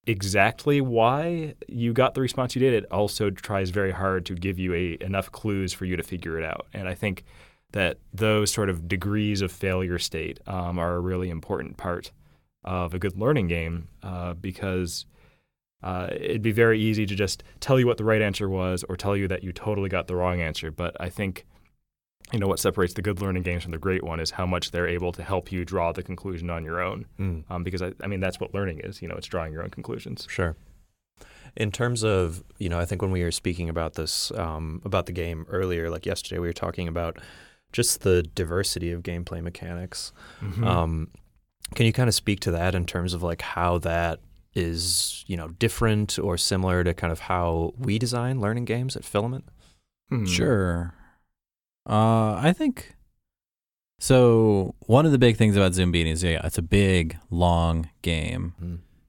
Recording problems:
none

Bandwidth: 17.5 kHz